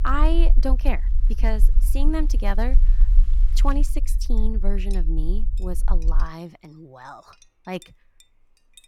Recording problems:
low rumble; noticeable; until 6 s; 15 dB below the speech
household noises; faint; throughout; 25 dB below the speech

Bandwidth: 17.5 kHz